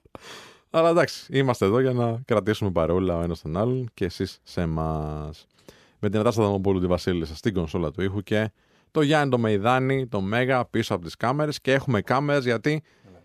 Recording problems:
none

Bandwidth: 14.5 kHz